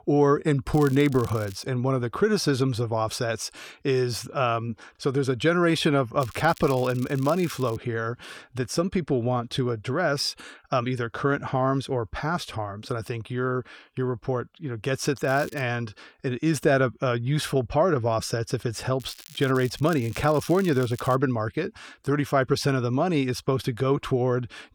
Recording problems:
crackling; noticeable; 4 times, first at 0.5 s; 20 dB below the speech

